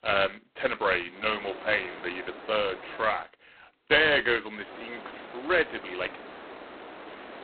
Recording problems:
phone-call audio; poor line; nothing above 4 kHz
hiss; noticeable; from 1 to 3 s and from 4.5 s on; 15 dB below the speech
uneven, jittery; strongly; from 0.5 to 6 s

